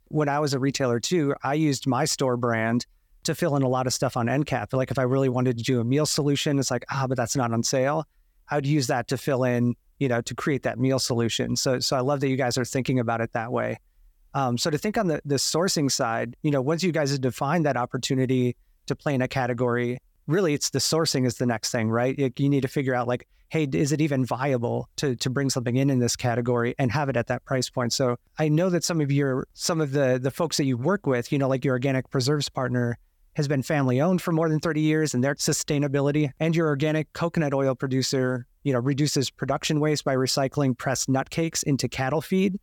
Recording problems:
none

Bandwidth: 18 kHz